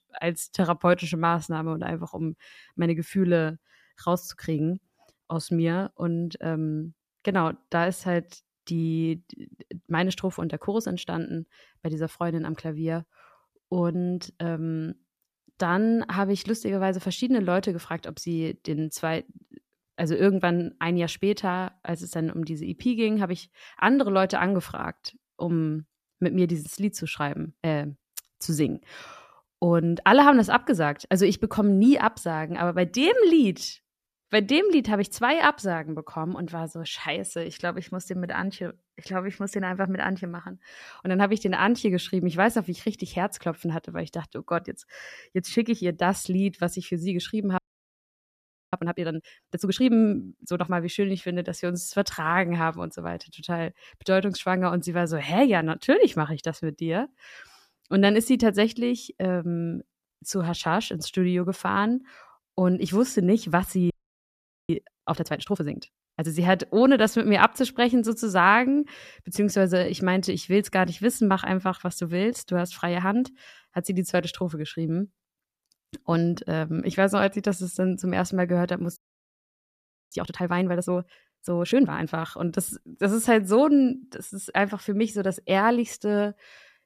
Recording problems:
audio freezing; at 48 s for 1 s, at 1:04 for 1 s and at 1:19 for 1 s

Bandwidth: 14.5 kHz